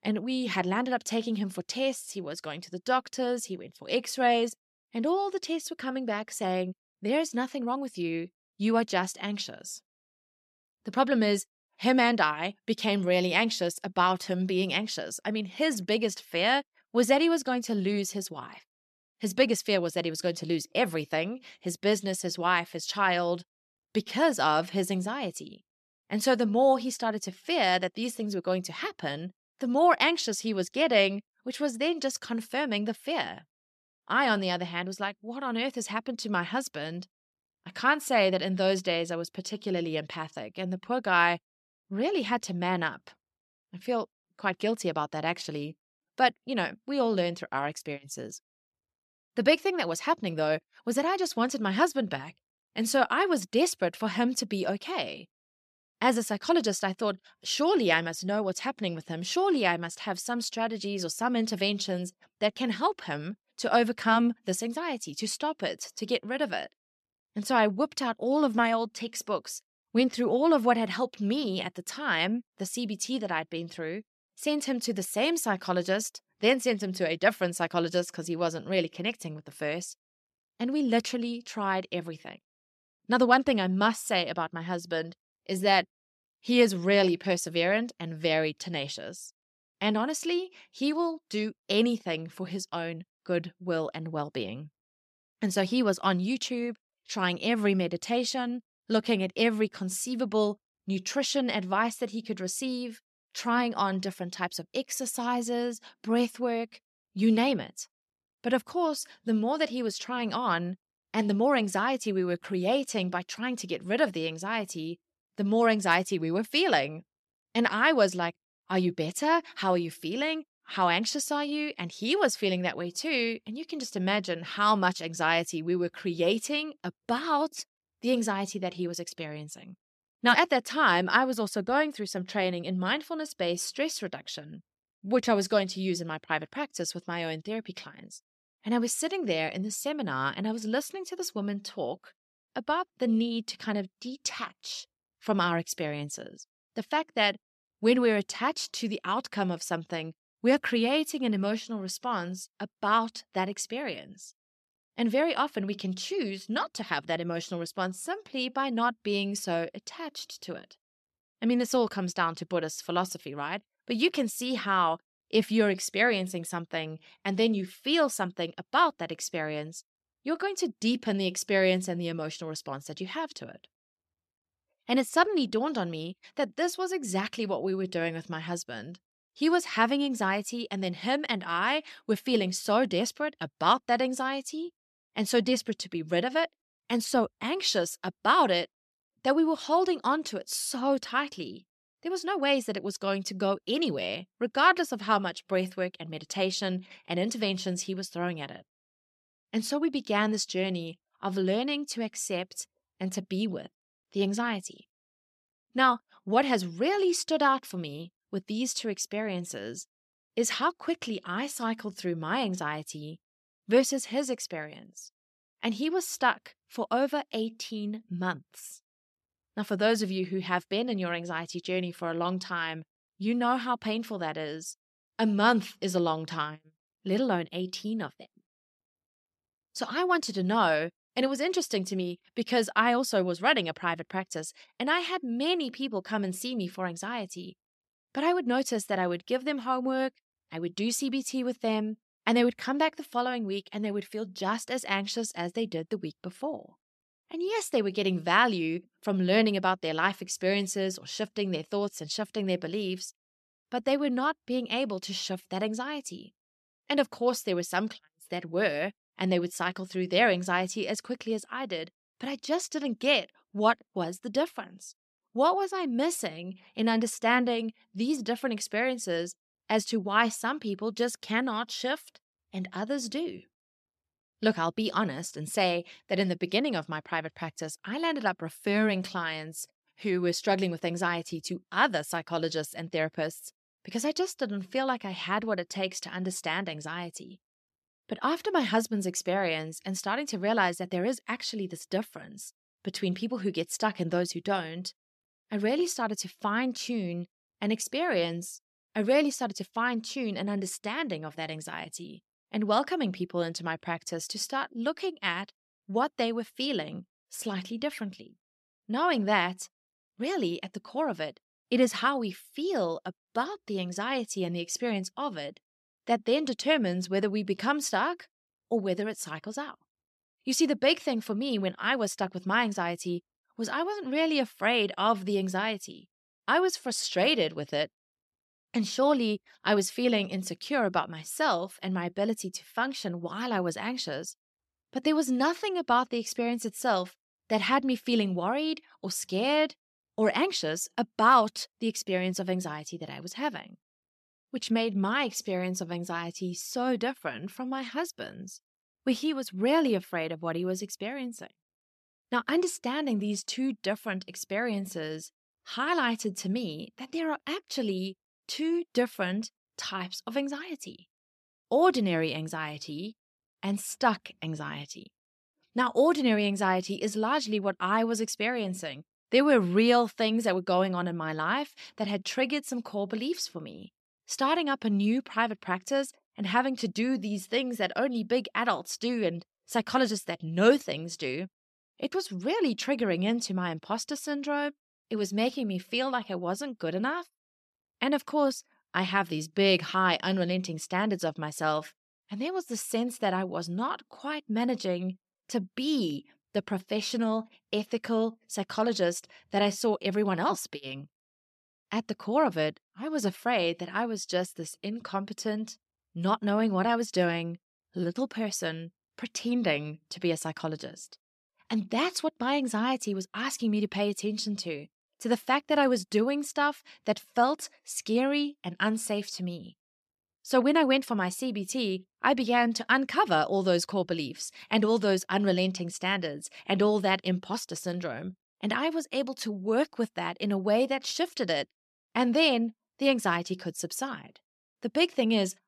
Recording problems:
none

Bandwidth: 13.5 kHz